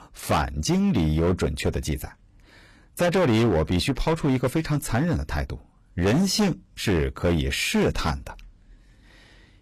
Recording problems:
distortion; heavy; 11% of the sound clipped

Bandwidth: 14.5 kHz